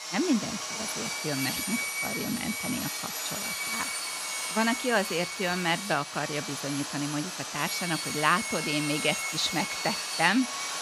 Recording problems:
machinery noise; loud; throughout; 2 dB below the speech

